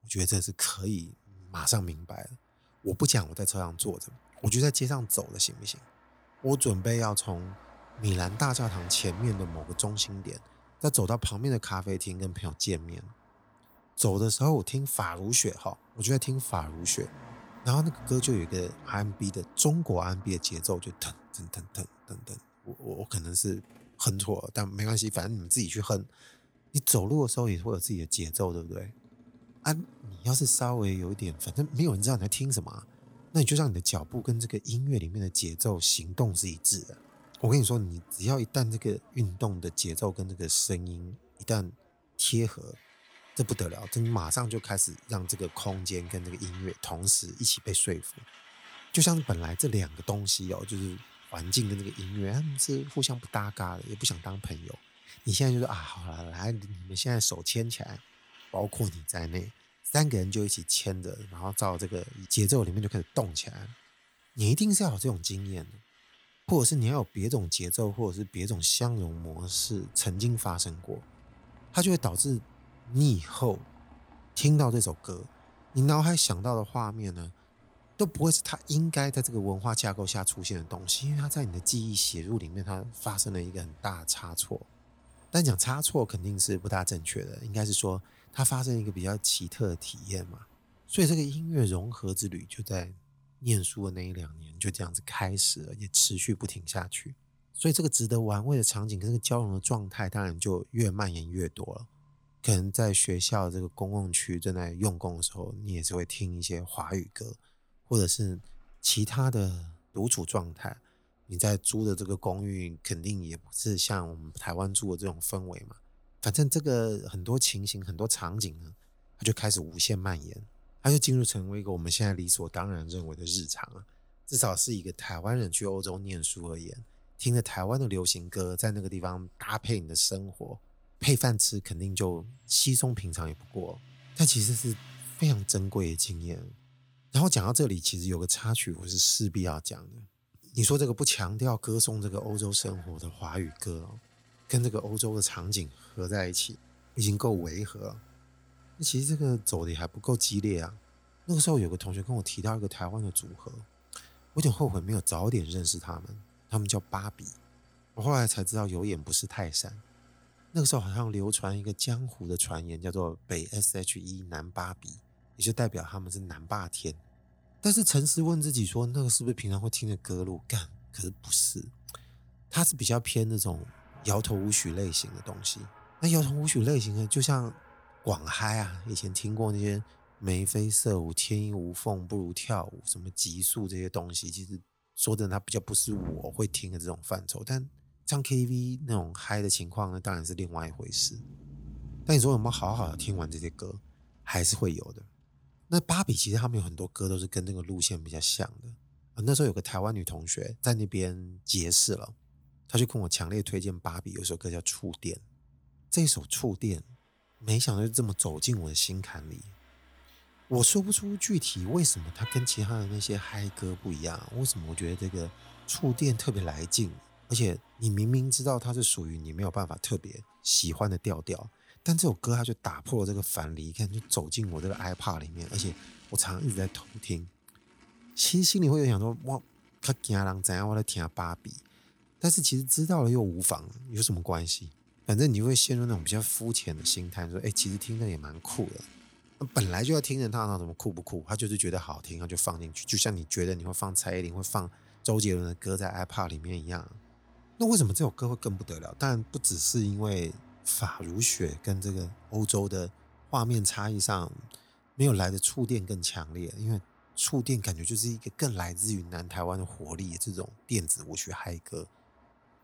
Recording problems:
traffic noise; faint; throughout; 25 dB below the speech

